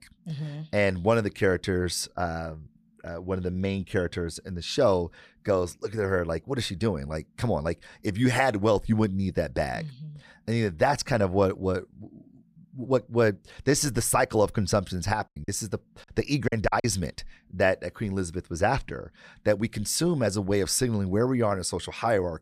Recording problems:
choppy; very; from 15 to 17 s; 18% of the speech affected

